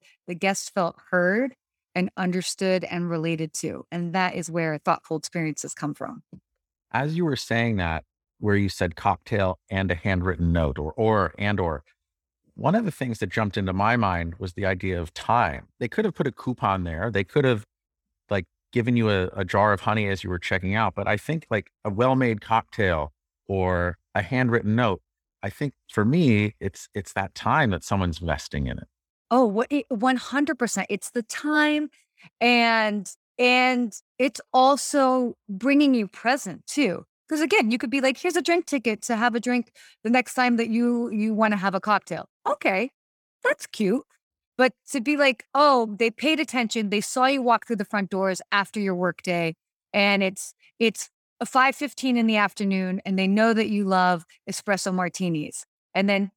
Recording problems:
none

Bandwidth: 18.5 kHz